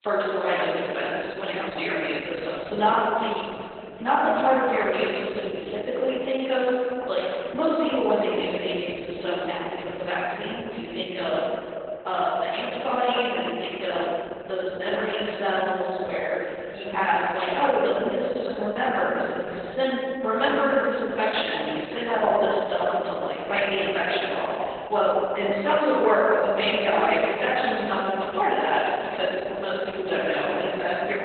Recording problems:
room echo; strong; dies away in 3 s
off-mic speech; far
garbled, watery; badly; nothing above 4 kHz
thin; somewhat; fading below 400 Hz

